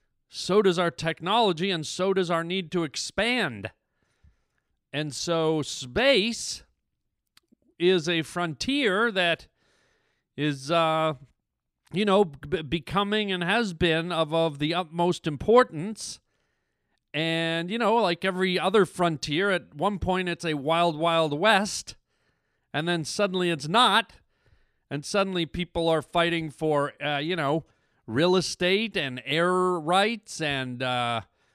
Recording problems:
none

